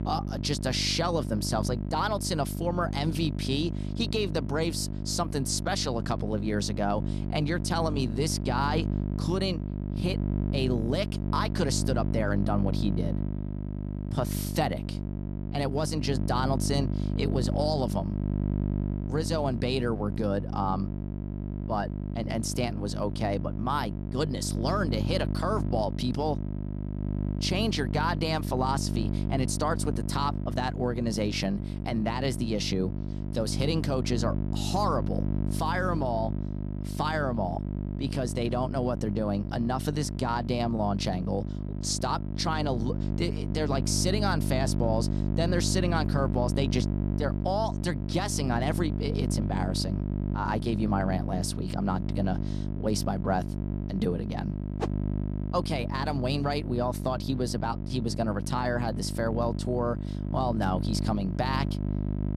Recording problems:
electrical hum; loud; throughout; 50 Hz, 10 dB below the speech

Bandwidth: 13.5 kHz